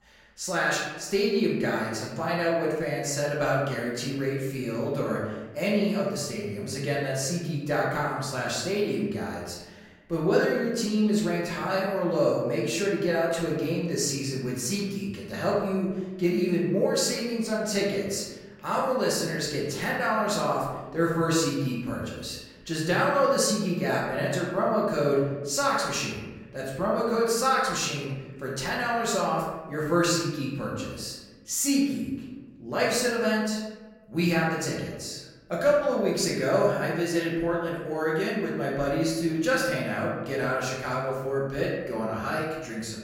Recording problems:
off-mic speech; far
room echo; noticeable; dies away in 1.1 s

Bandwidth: 16 kHz